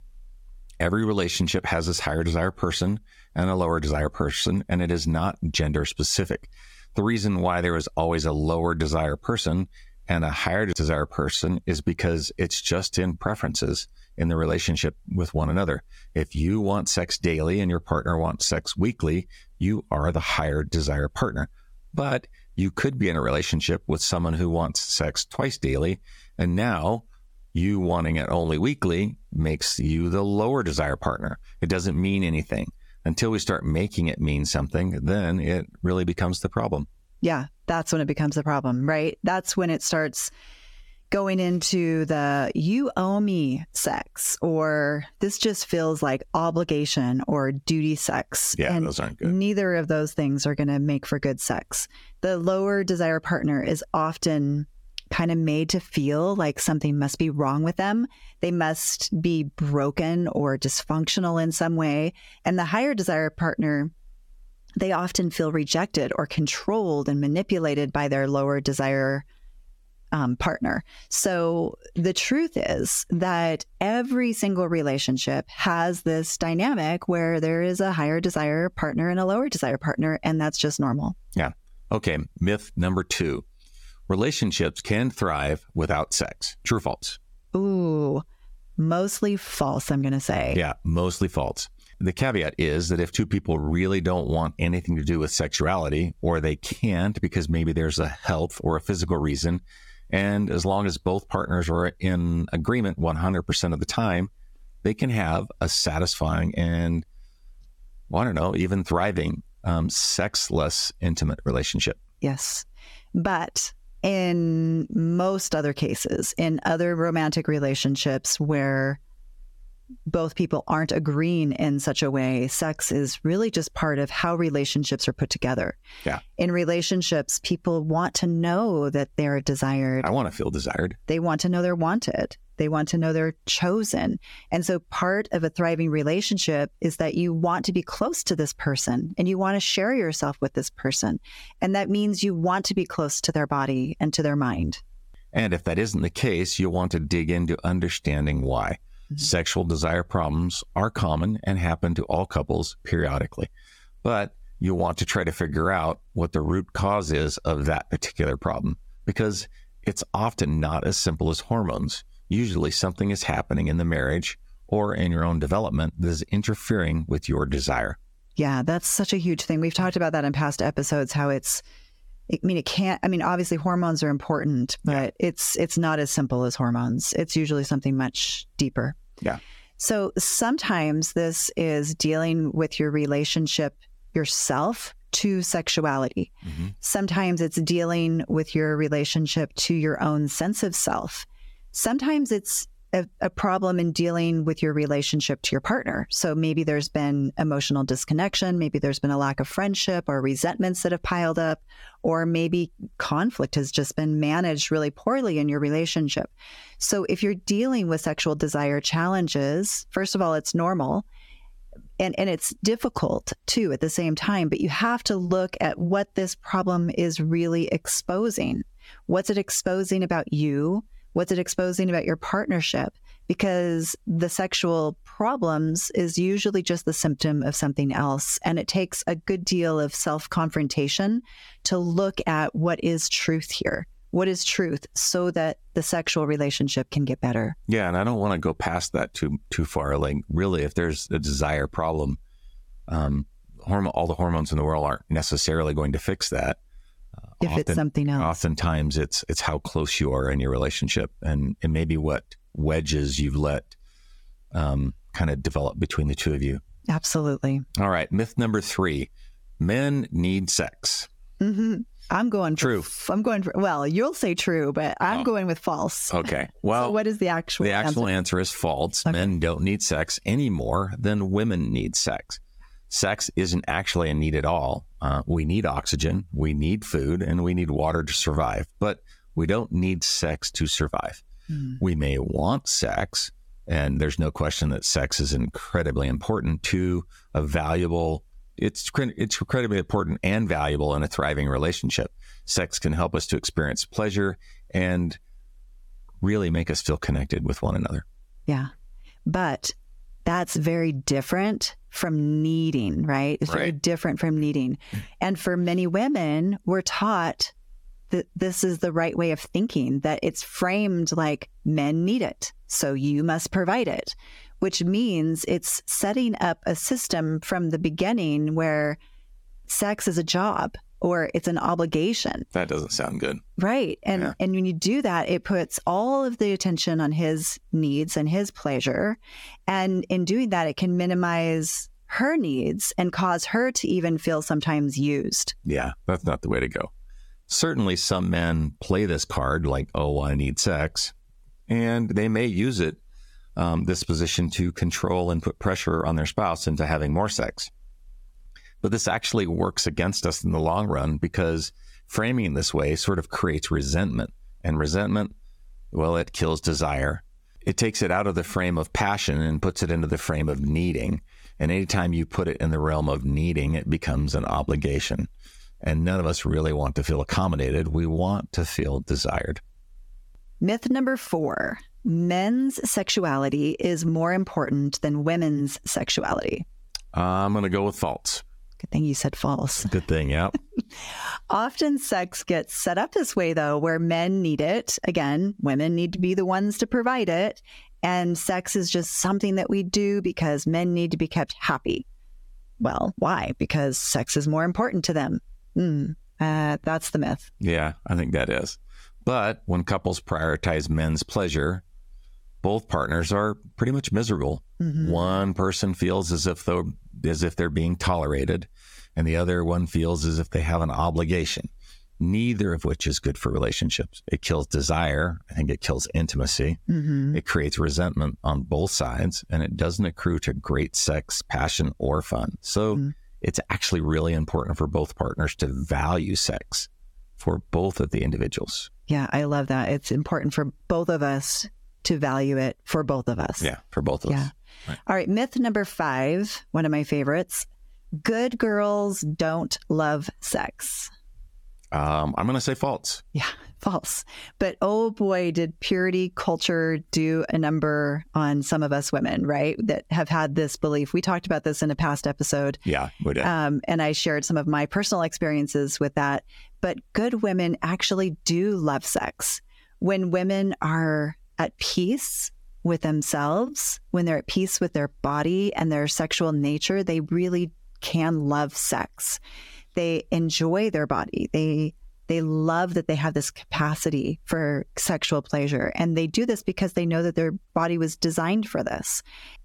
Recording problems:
squashed, flat; somewhat

